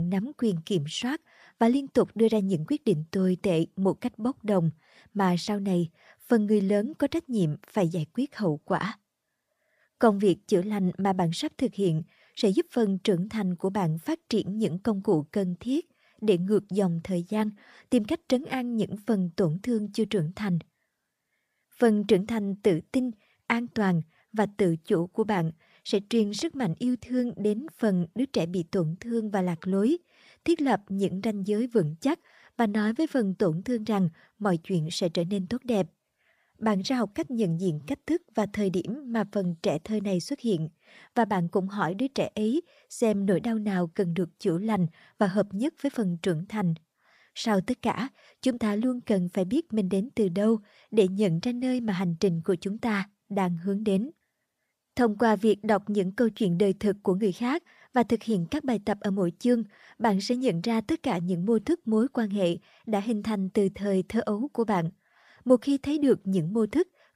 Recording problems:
abrupt cut into speech; at the start

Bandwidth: 15 kHz